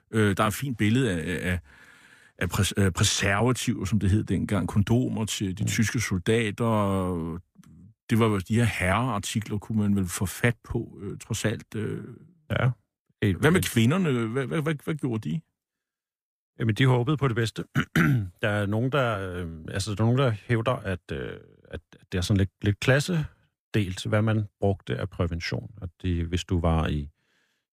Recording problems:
none

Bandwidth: 15 kHz